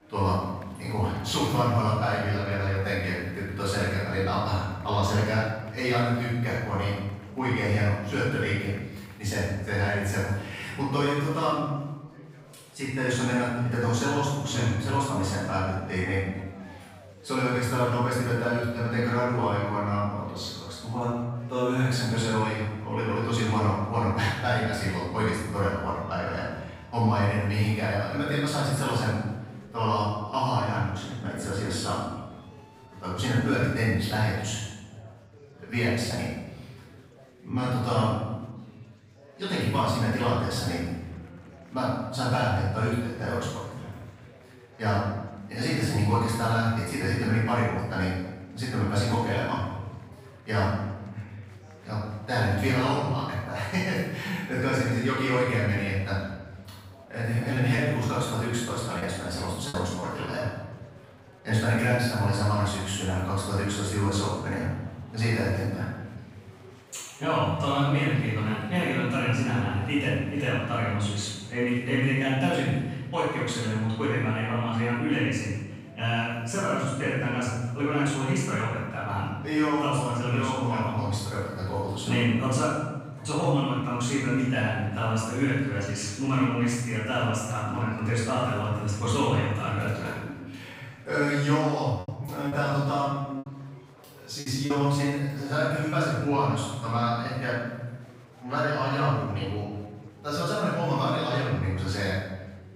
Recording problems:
room echo; strong; dies away in 1.1 s
off-mic speech; far
chatter from many people; faint; throughout; 25 dB below the speech
choppy; very; from 58 s to 1:00 and from 1:32 to 1:36; 6% of the speech affected

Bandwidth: 15.5 kHz